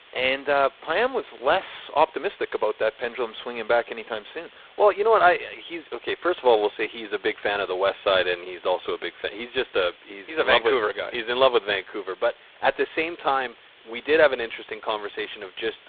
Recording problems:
phone-call audio; poor line
hiss; faint; throughout; 25 dB below the speech

